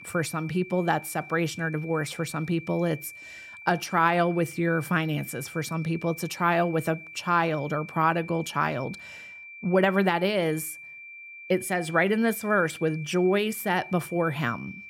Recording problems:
high-pitched whine; noticeable; throughout; 2.5 kHz, 15 dB below the speech

